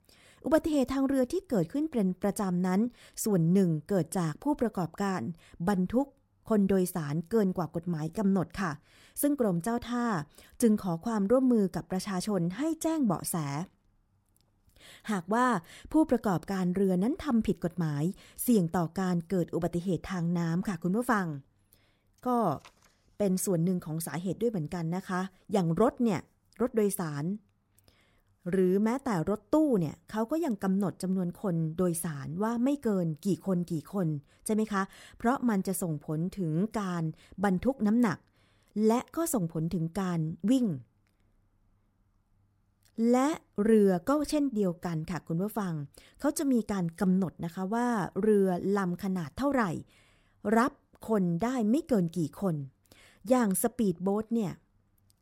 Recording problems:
uneven, jittery; slightly; from 8 to 45 s

